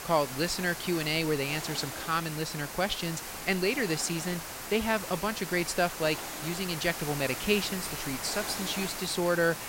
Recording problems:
hiss; loud; throughout; 6 dB below the speech

